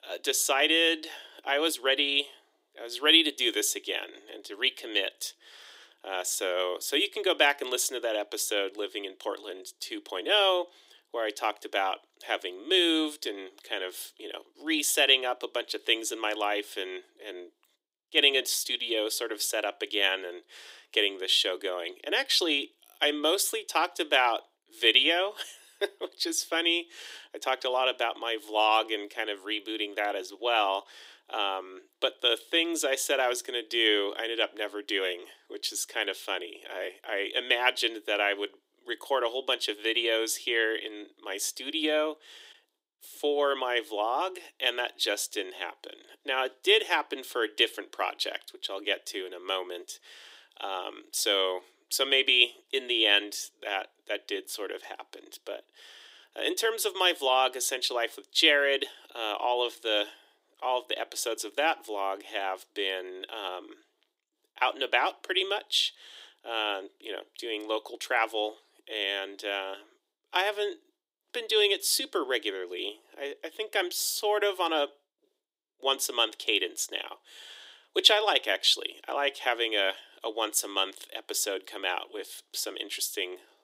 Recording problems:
thin; very; fading below 300 Hz

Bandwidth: 15.5 kHz